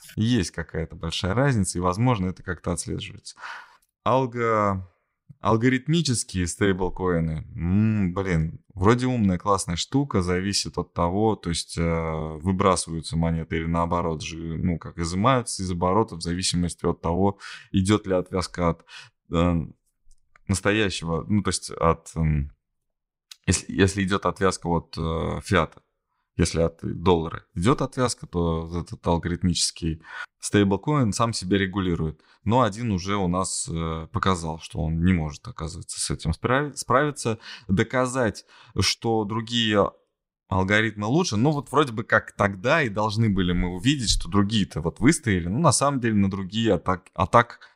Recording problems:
none

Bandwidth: 15.5 kHz